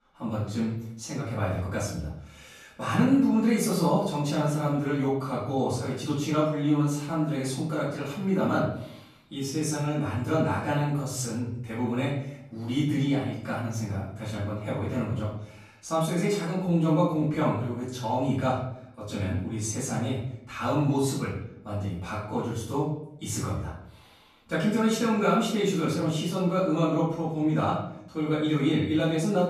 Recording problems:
off-mic speech; far
room echo; noticeable; dies away in 0.6 s

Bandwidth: 14.5 kHz